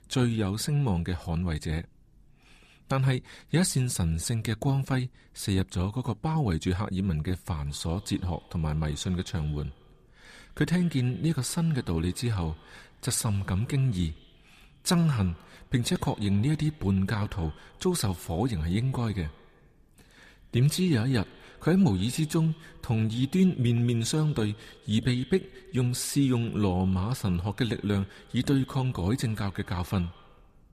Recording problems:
echo of what is said; faint; from 7.5 s on; 90 ms later, 25 dB below the speech

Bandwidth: 14.5 kHz